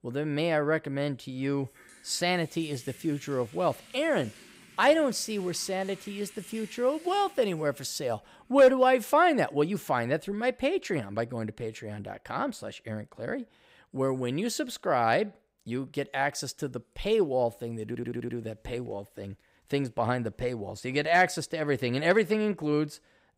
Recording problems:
household noises; faint; throughout; 25 dB below the speech
audio stuttering; at 18 s

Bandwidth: 15.5 kHz